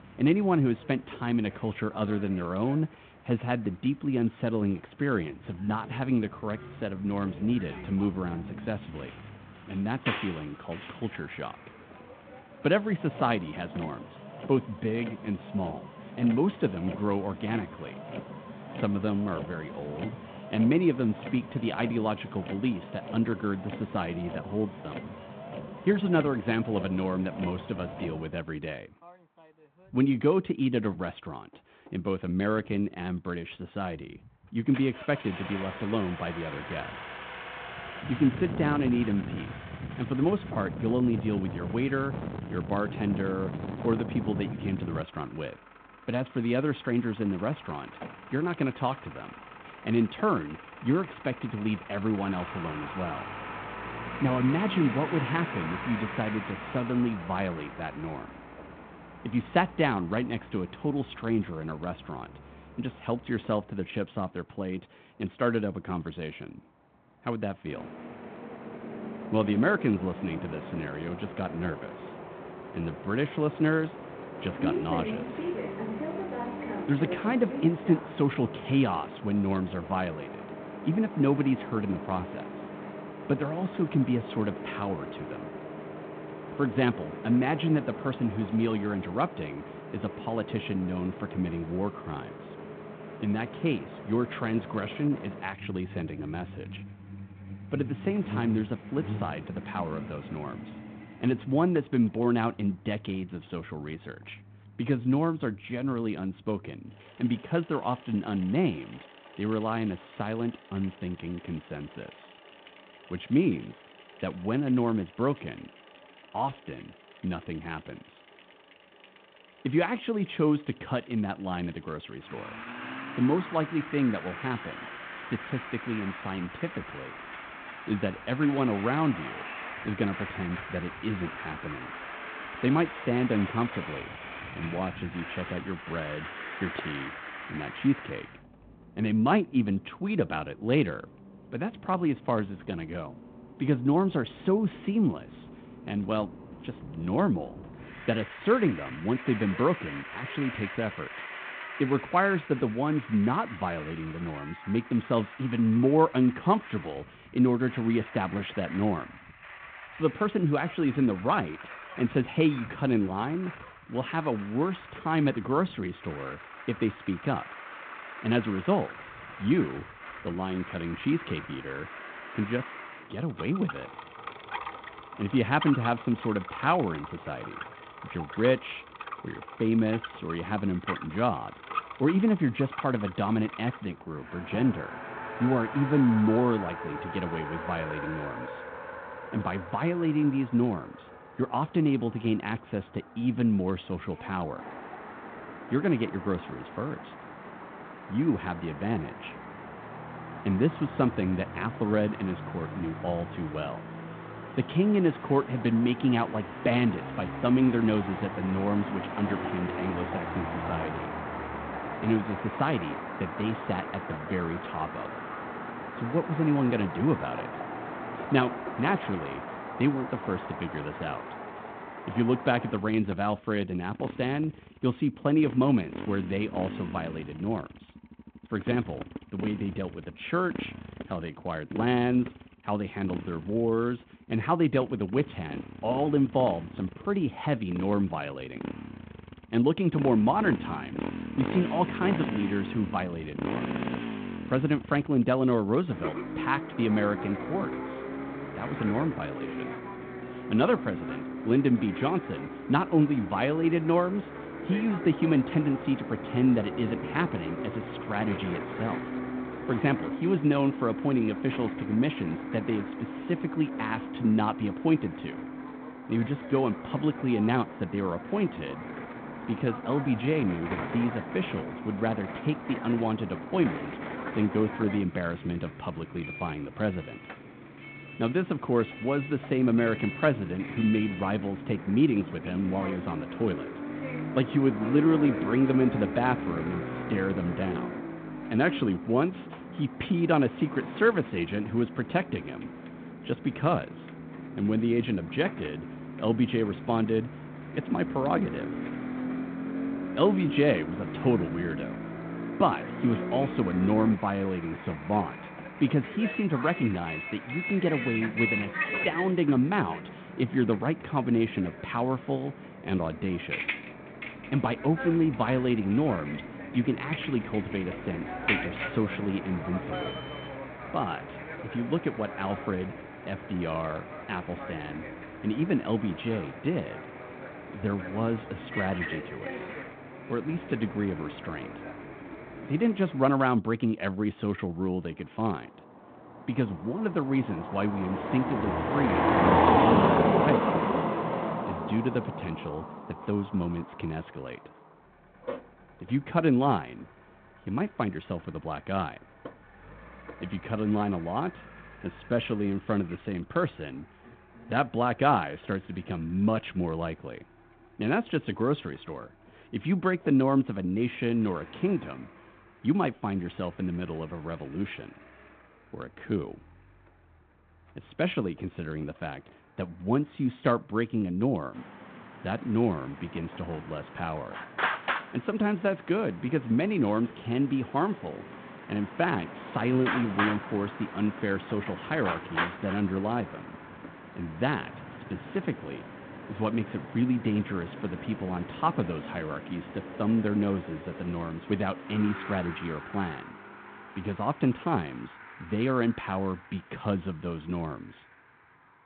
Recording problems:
phone-call audio
traffic noise; loud; throughout; 8 dB below the speech

